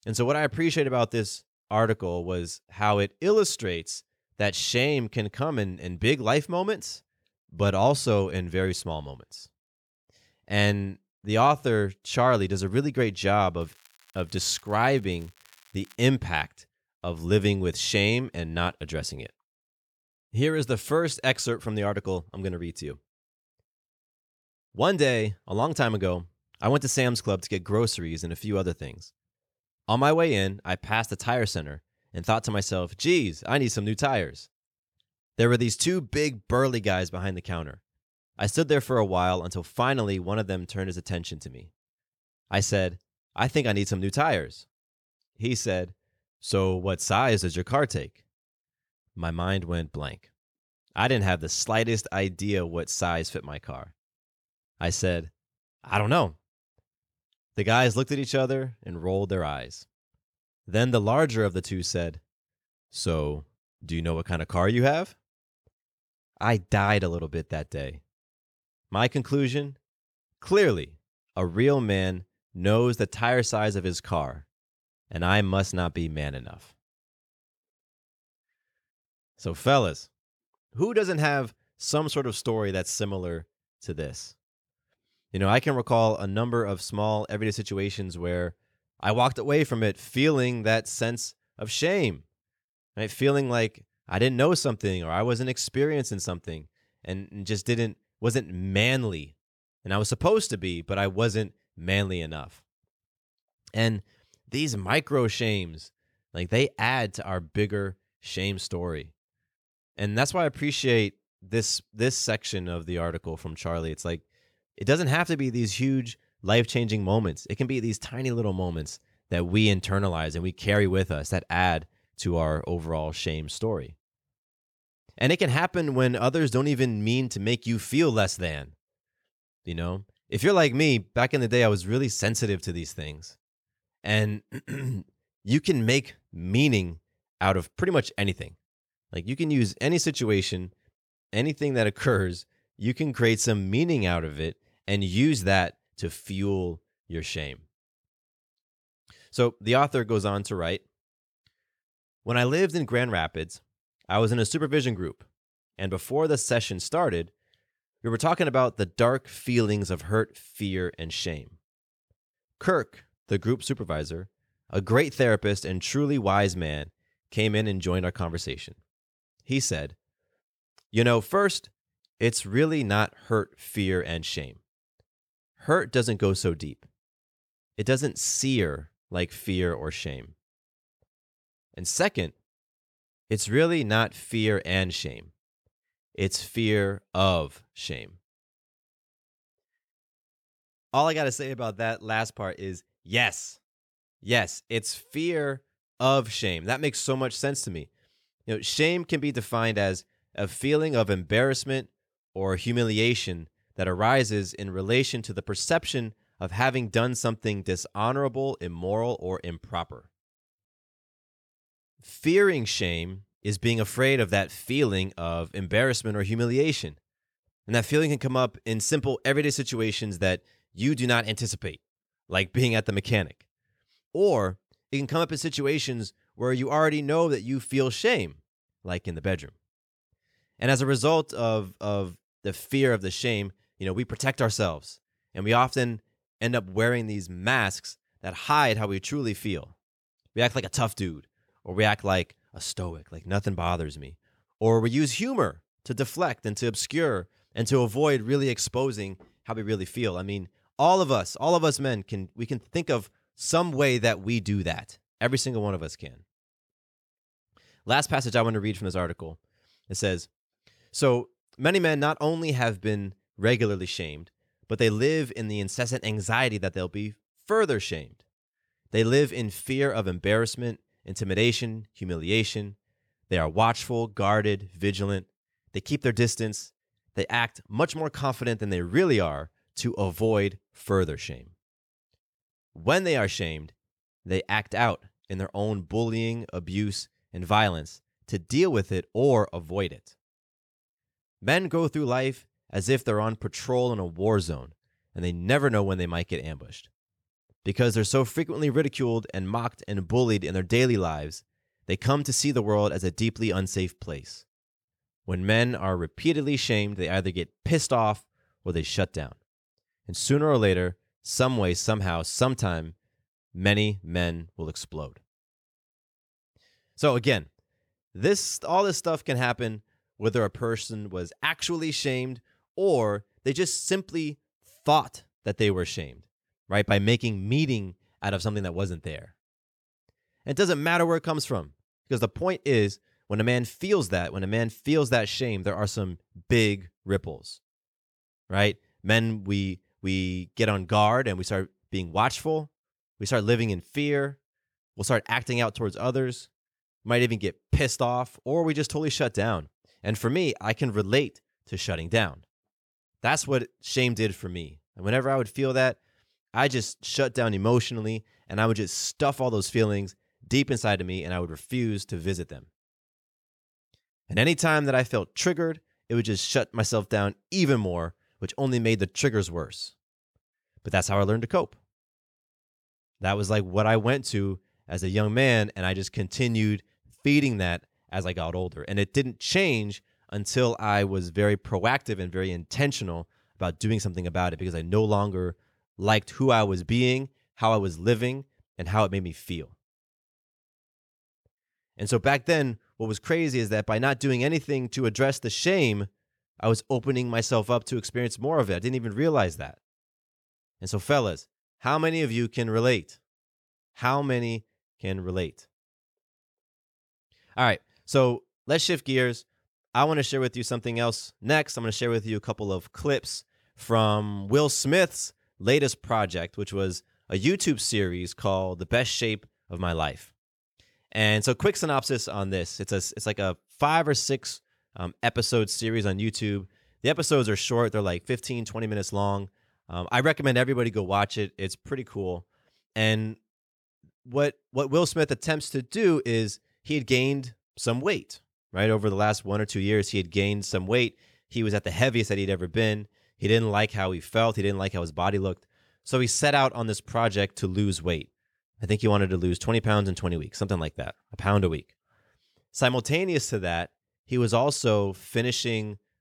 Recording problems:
crackling; faint; from 14 to 16 s; 30 dB below the speech

